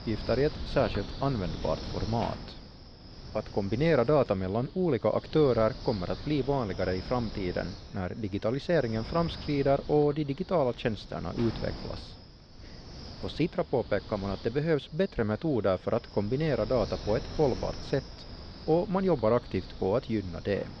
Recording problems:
muffled; very slightly; fading above 4 kHz
wind noise on the microphone; occasional gusts; 15 dB below the speech

